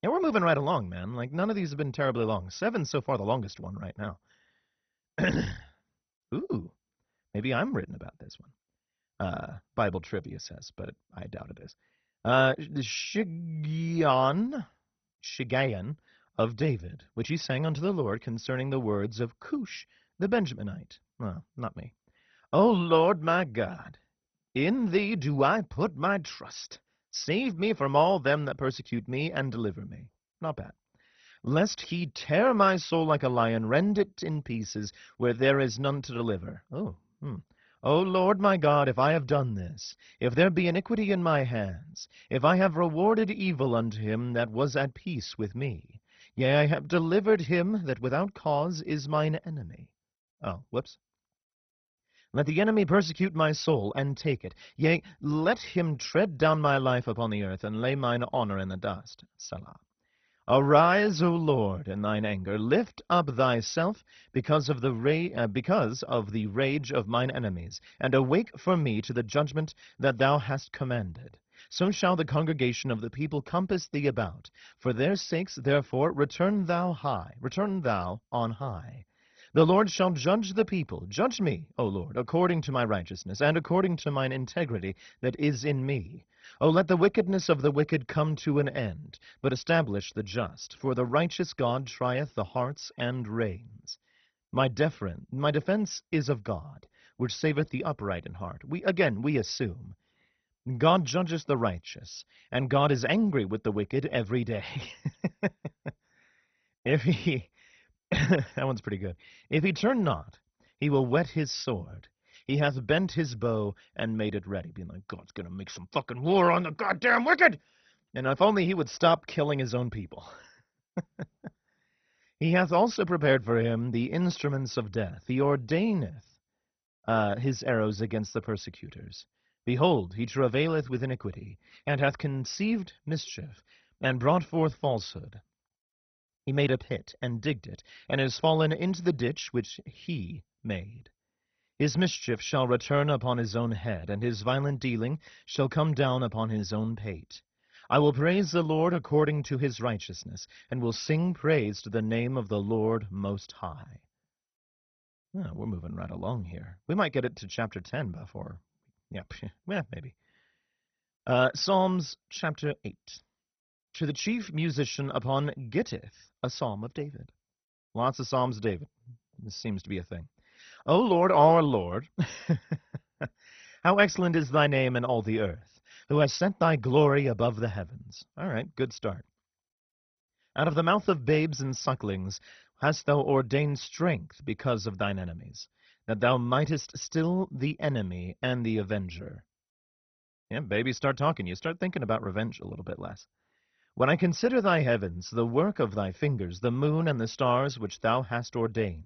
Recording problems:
garbled, watery; badly; nothing above 6 kHz

